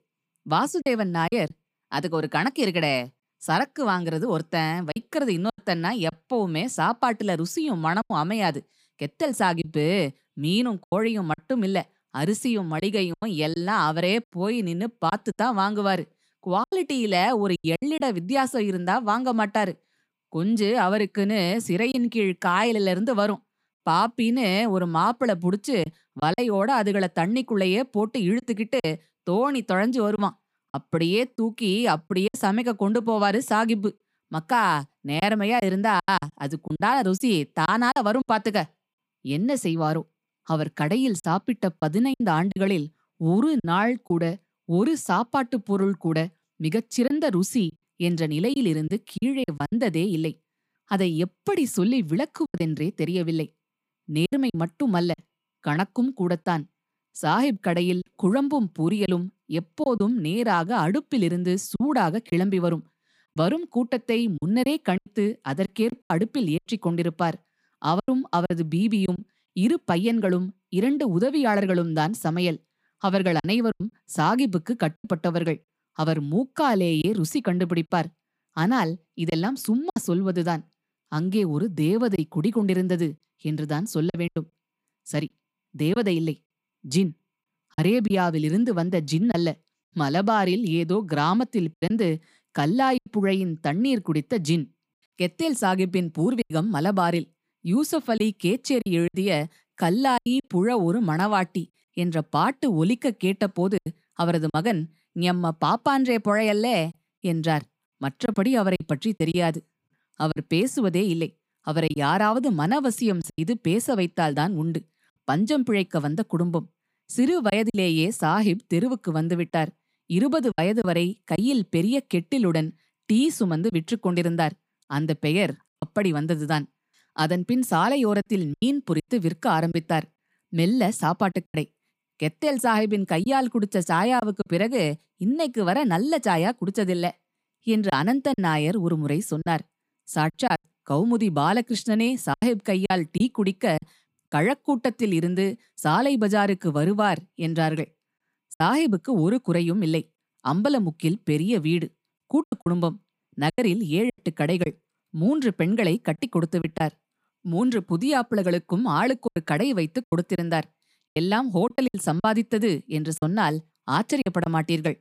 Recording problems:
choppy; occasionally; 5% of the speech affected

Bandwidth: 15 kHz